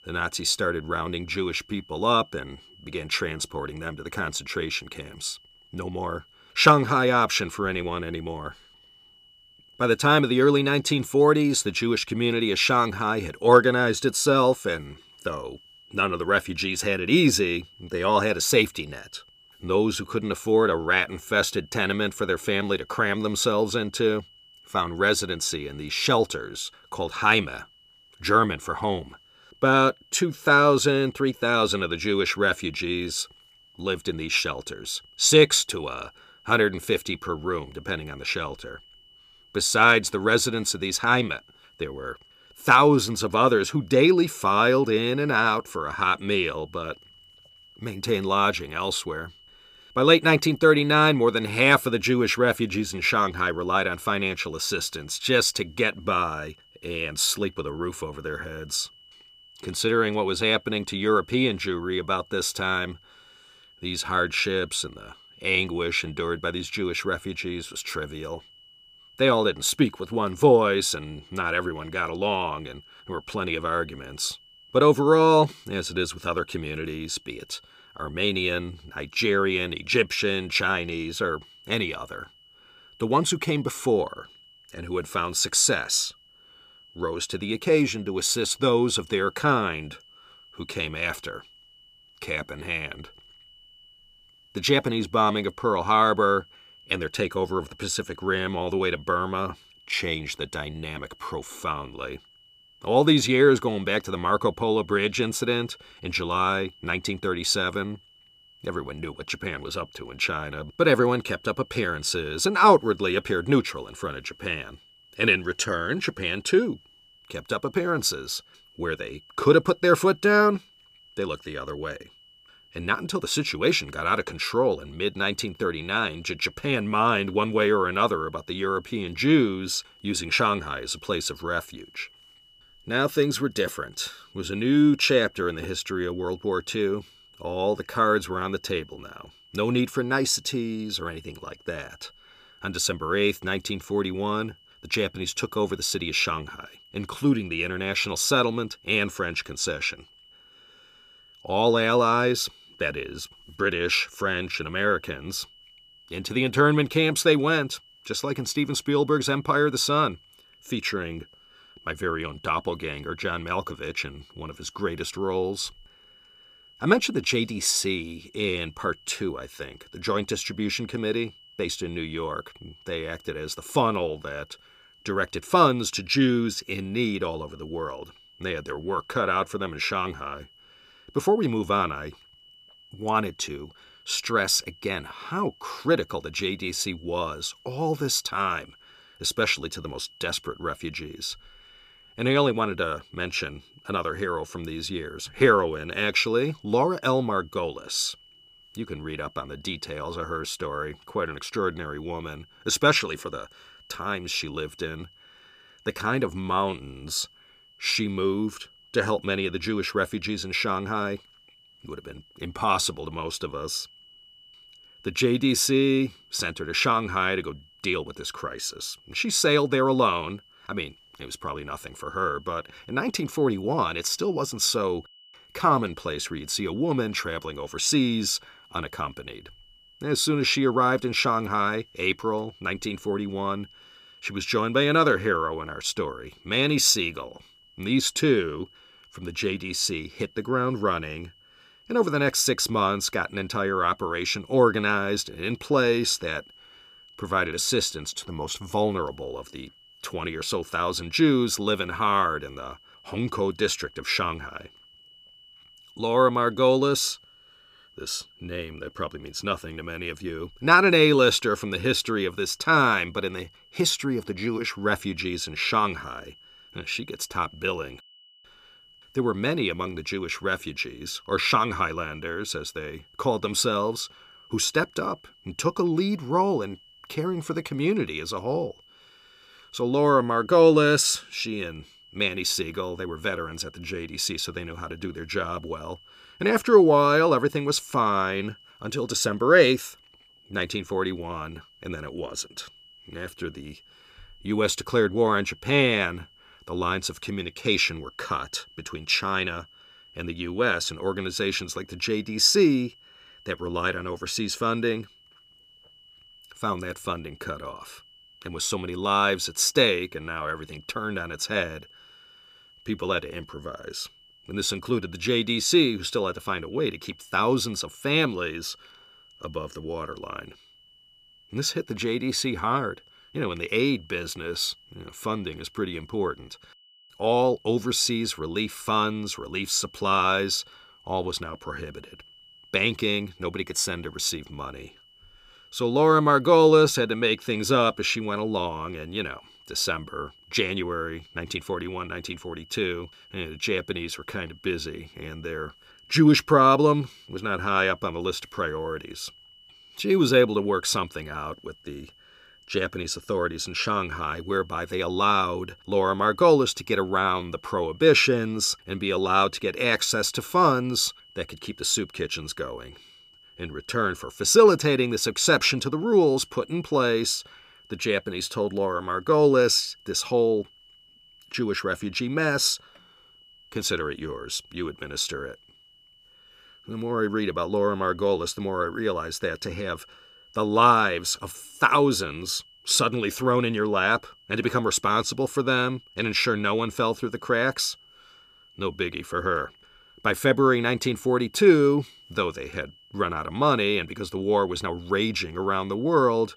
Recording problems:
high-pitched whine; faint; throughout; 3 kHz, 30 dB below the speech

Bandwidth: 15 kHz